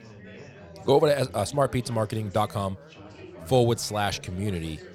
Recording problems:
background chatter; noticeable; throughout; 4 voices, 20 dB below the speech

